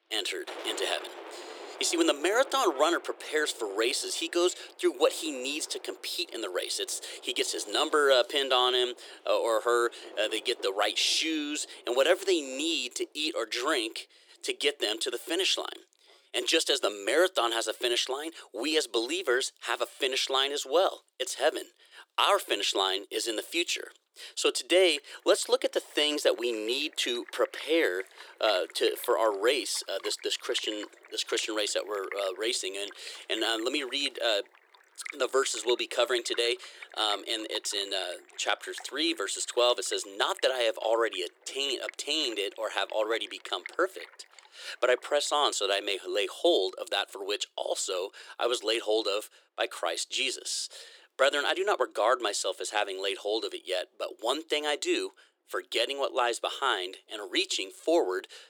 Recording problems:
thin; very; fading below 350 Hz
rain or running water; noticeable; throughout; 20 dB below the speech

